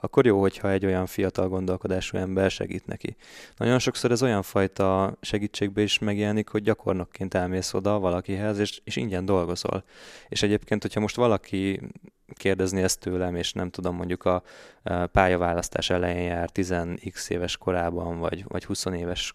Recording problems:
none

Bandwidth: 14.5 kHz